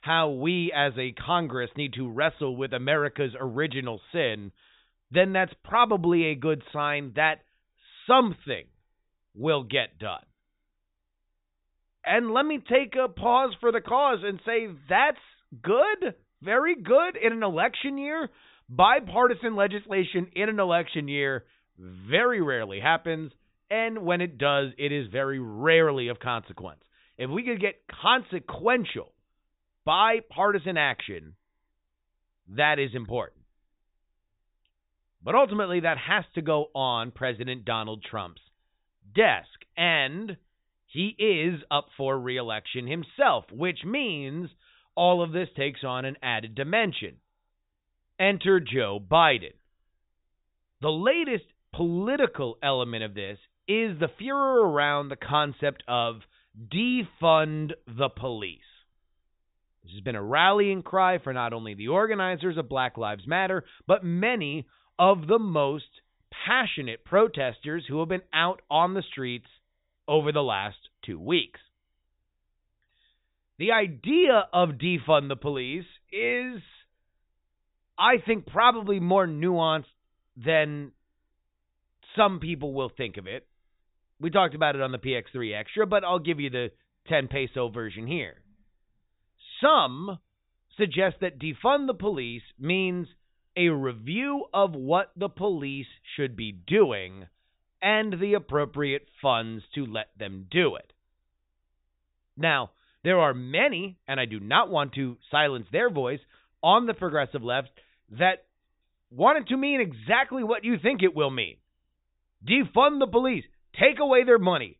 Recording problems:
high frequencies cut off; severe; nothing above 4 kHz

